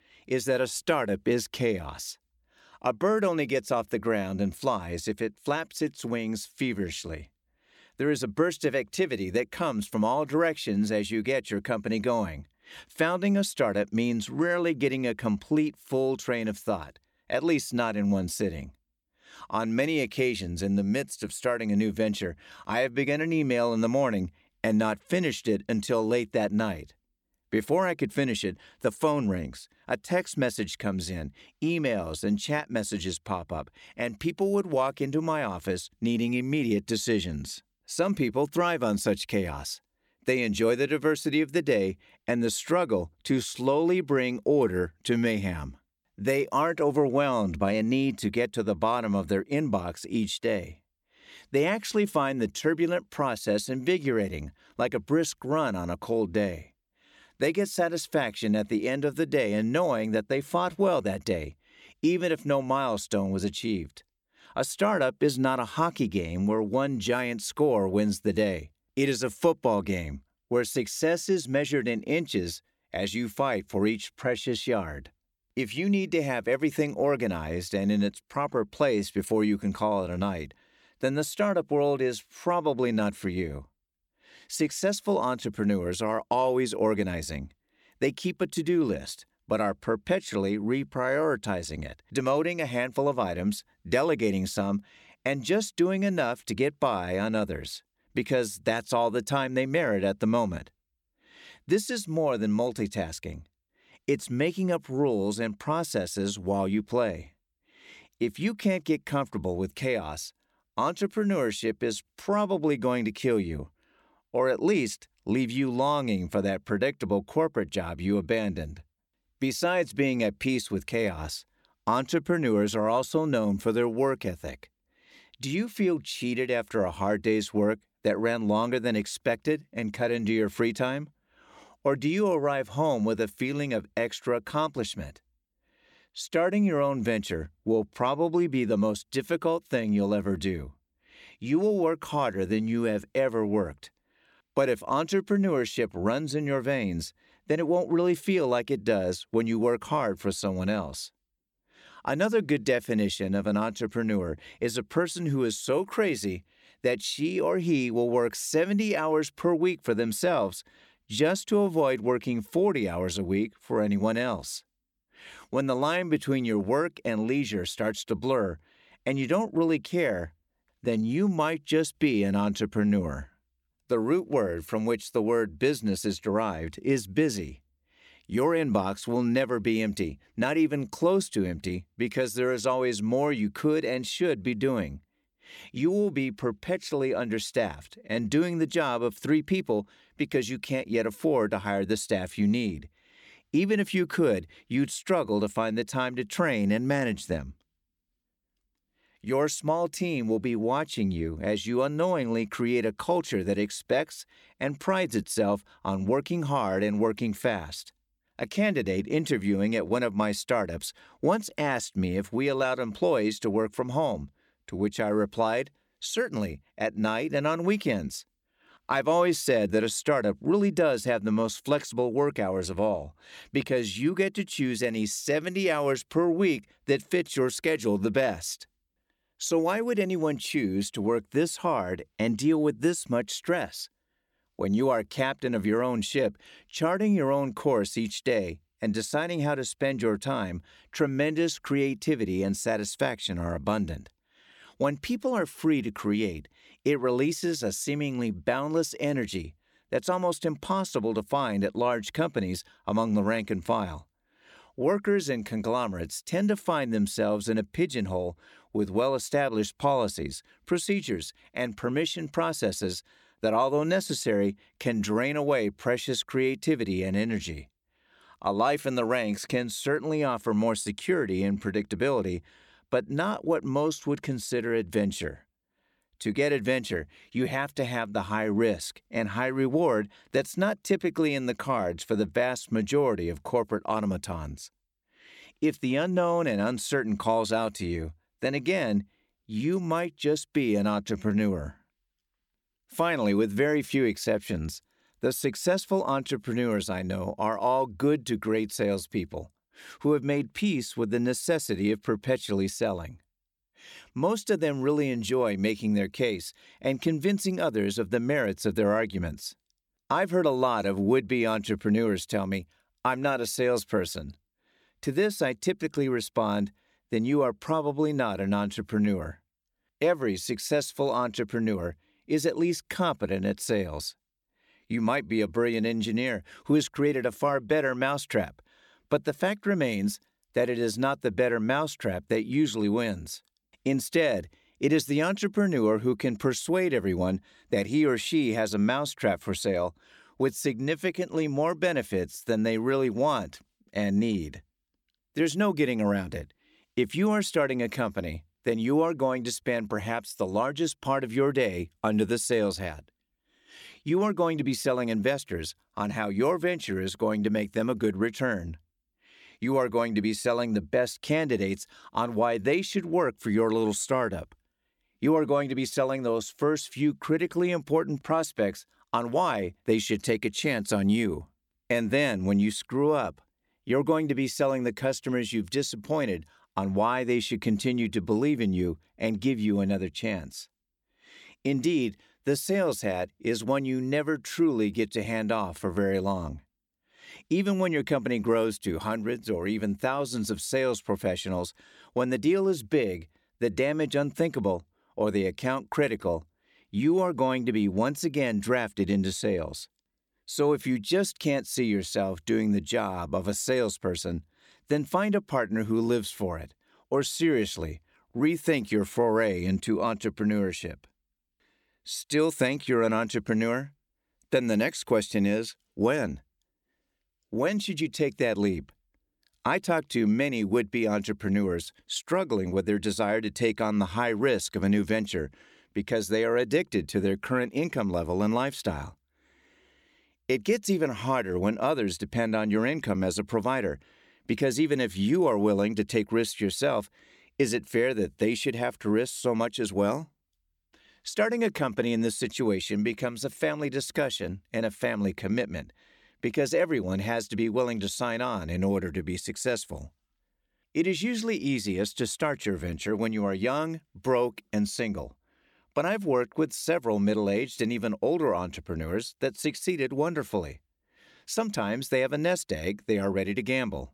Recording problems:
none

